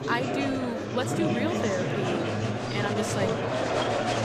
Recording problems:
murmuring crowd; very loud; throughout; 3 dB above the speech

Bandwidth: 15 kHz